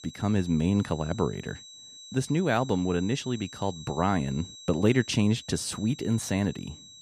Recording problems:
high-pitched whine; noticeable; throughout; 4 kHz, 15 dB below the speech

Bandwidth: 14.5 kHz